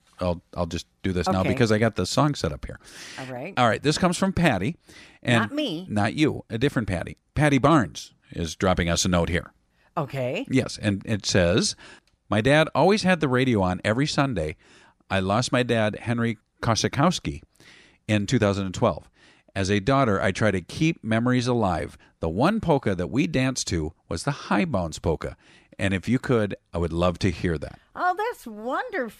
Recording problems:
none

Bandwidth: 14.5 kHz